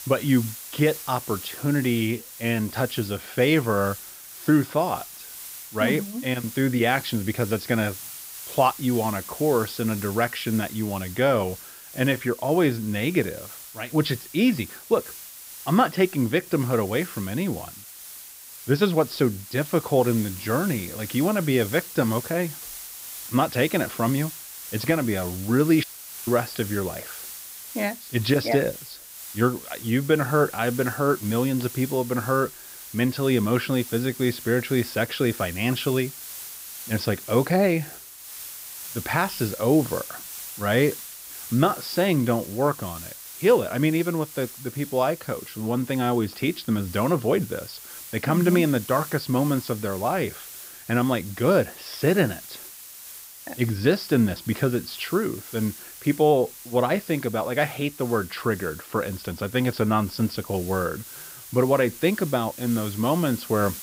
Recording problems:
high frequencies cut off; noticeable; nothing above 5.5 kHz
hiss; noticeable; throughout; 15 dB below the speech

